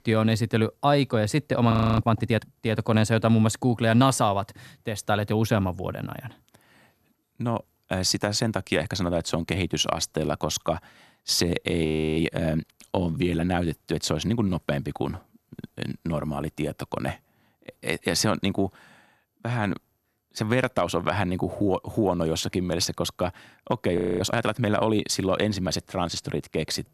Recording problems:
audio freezing; at 1.5 s, at 12 s and at 24 s

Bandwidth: 13.5 kHz